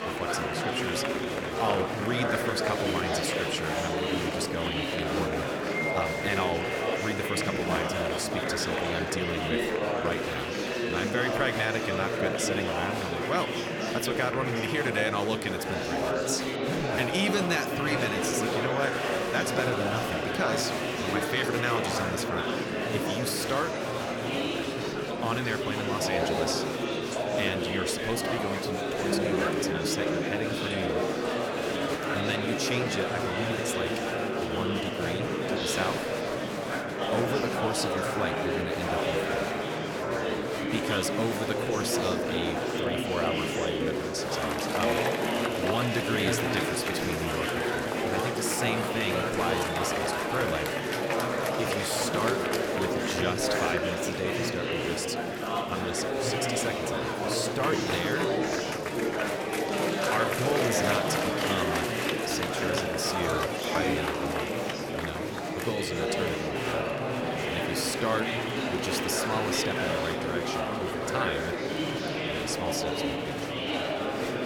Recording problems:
murmuring crowd; very loud; throughout; 4 dB above the speech

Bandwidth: 17.5 kHz